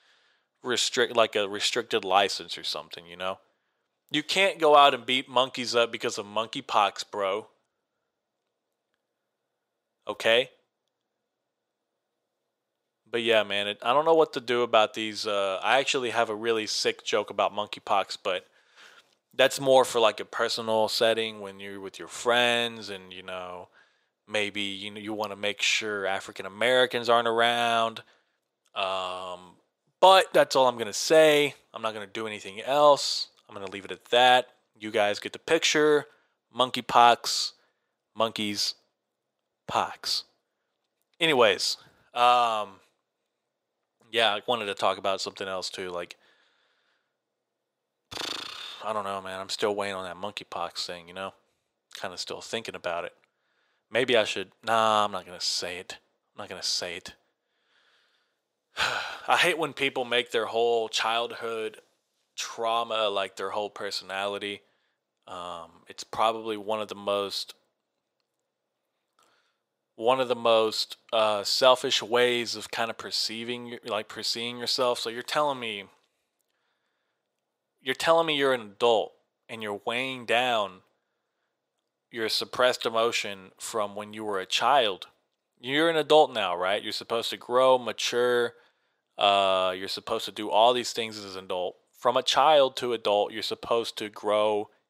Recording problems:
thin; very; fading below 600 Hz

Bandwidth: 15.5 kHz